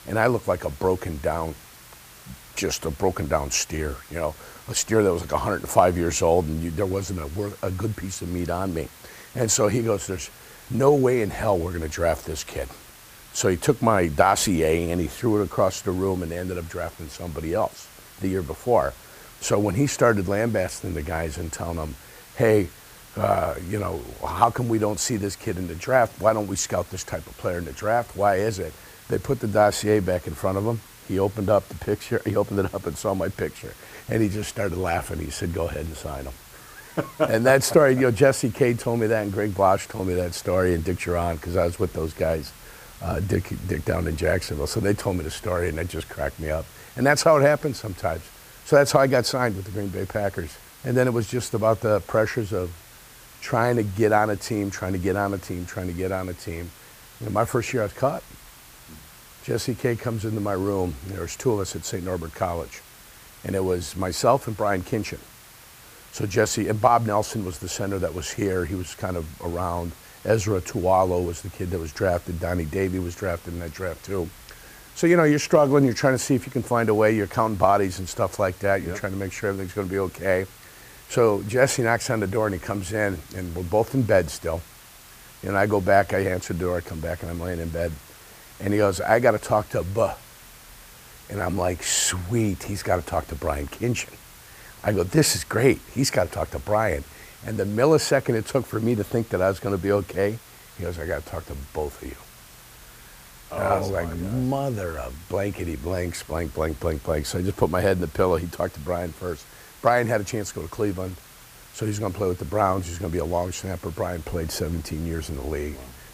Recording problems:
hiss; faint; throughout; 20 dB below the speech

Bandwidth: 15 kHz